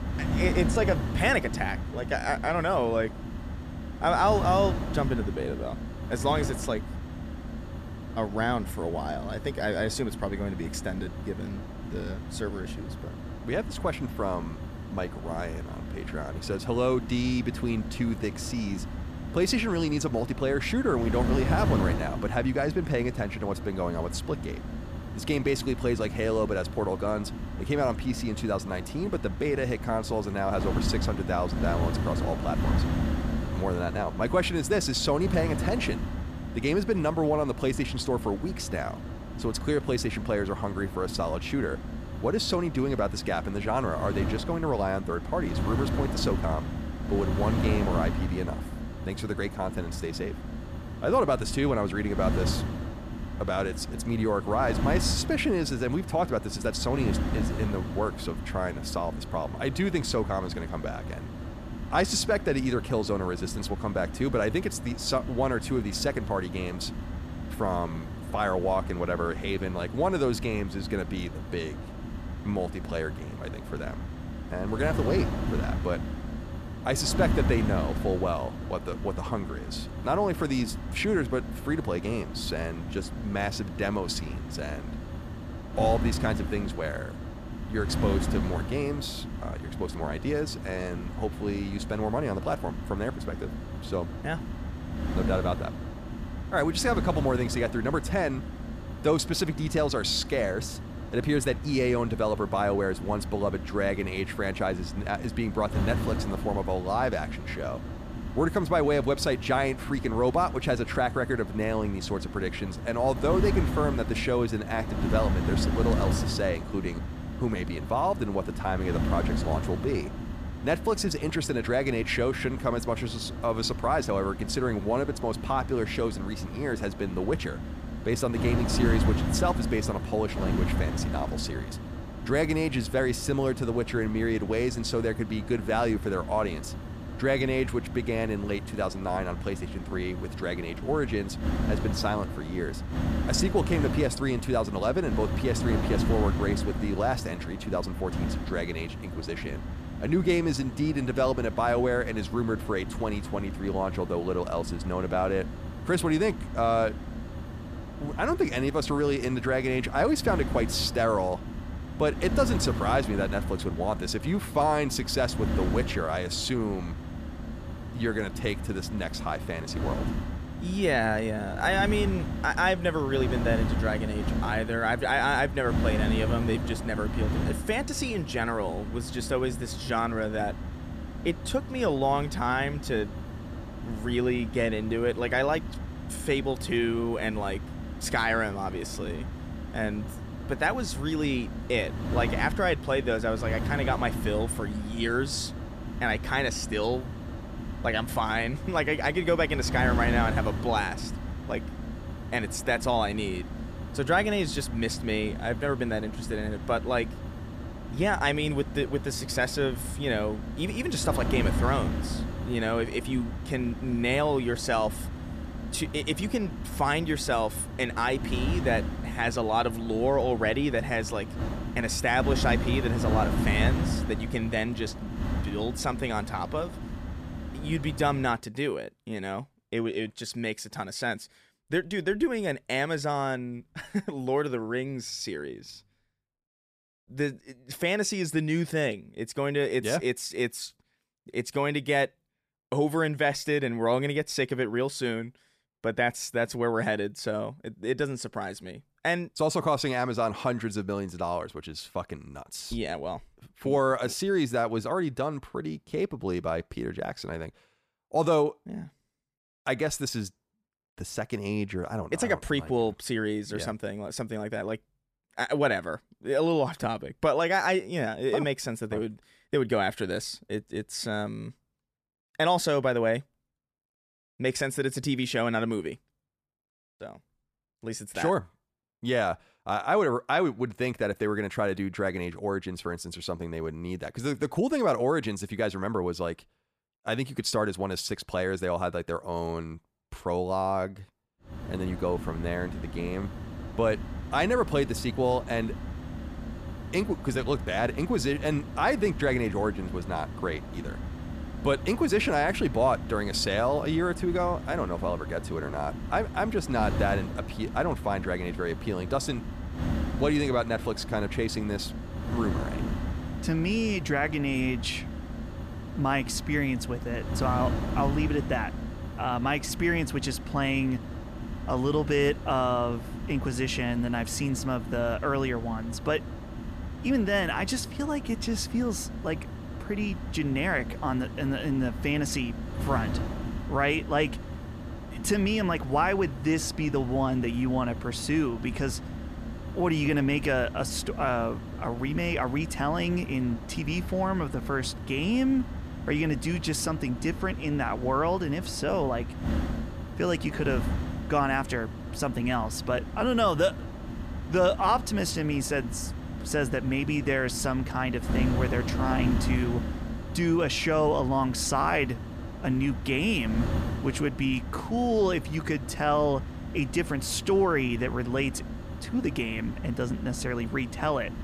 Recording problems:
wind noise on the microphone; occasional gusts; until 3:48 and from 4:52 on; 10 dB below the speech

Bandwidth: 14.5 kHz